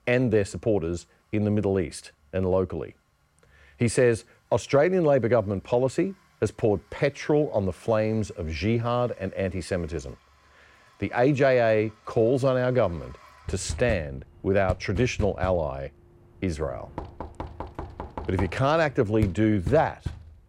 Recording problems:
household noises; noticeable; throughout; 15 dB below the speech

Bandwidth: 16 kHz